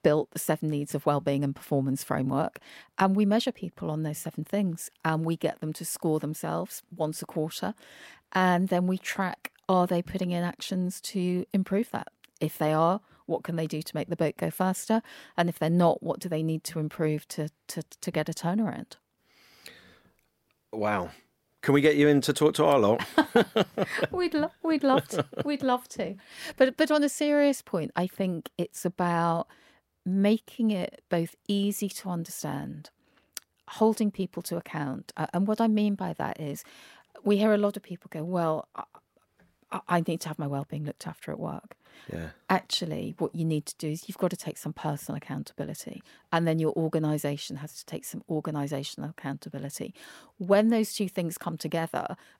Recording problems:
none

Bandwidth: 16 kHz